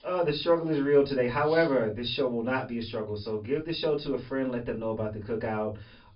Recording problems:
off-mic speech; far
high frequencies cut off; noticeable; nothing above 5.5 kHz
room echo; very slight; dies away in 0.2 s

